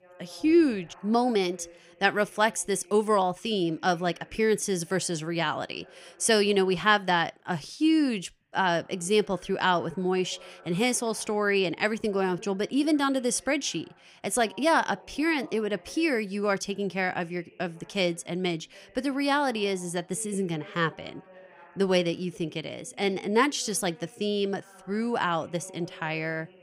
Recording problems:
voice in the background; faint; throughout; 25 dB below the speech

